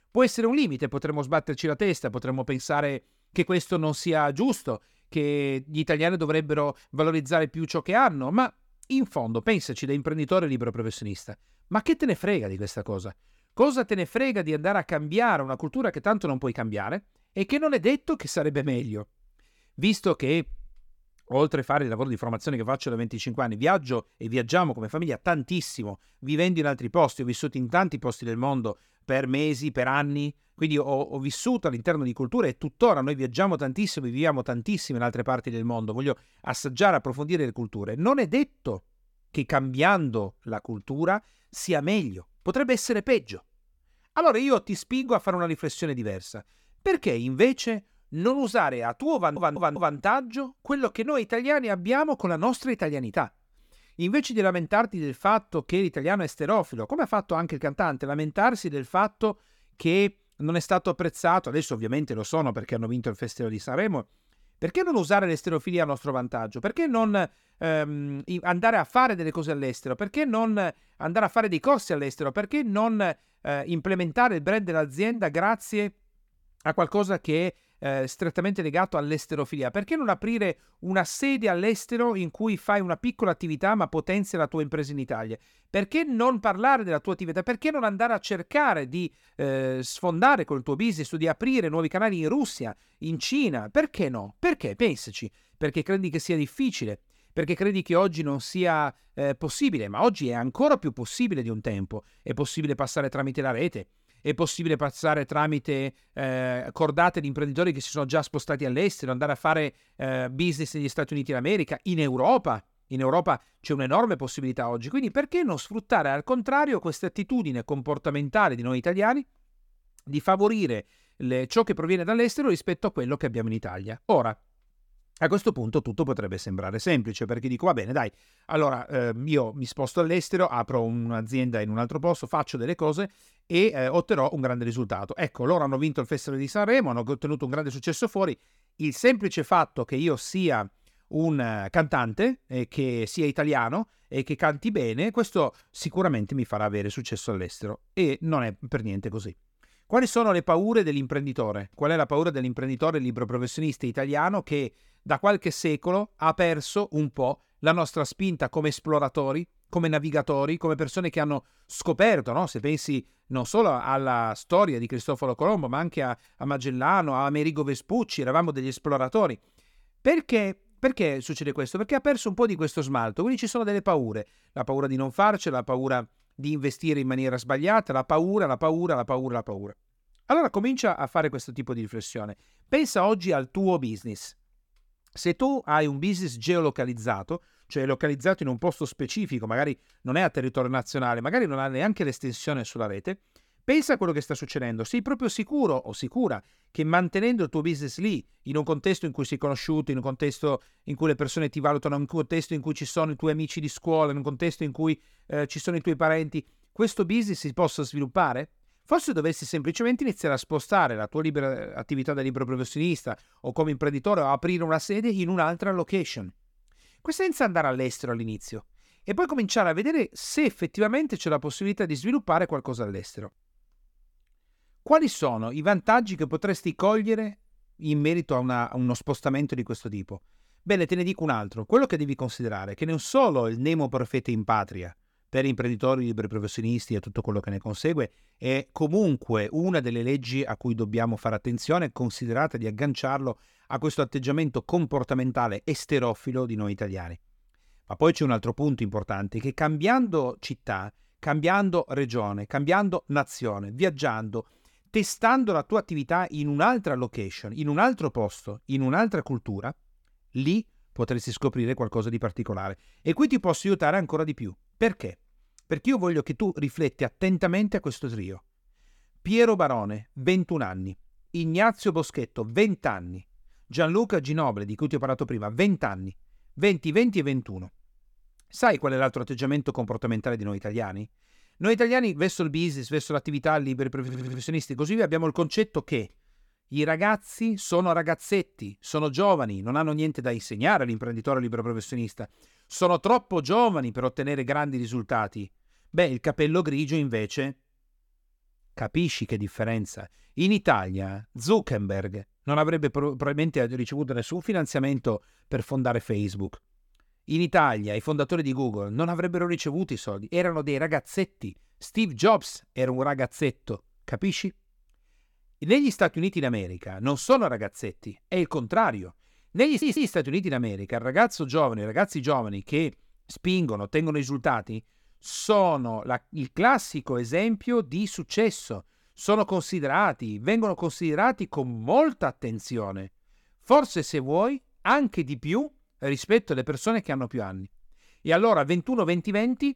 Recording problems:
audio stuttering; at 49 s, at 4:44 and at 5:20

